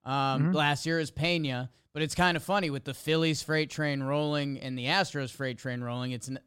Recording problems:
none

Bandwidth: 16 kHz